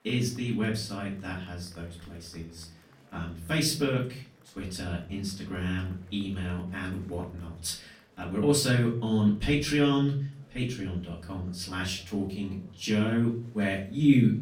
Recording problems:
off-mic speech; far
room echo; slight; dies away in 0.4 s
murmuring crowd; faint; throughout; 30 dB below the speech

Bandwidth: 16.5 kHz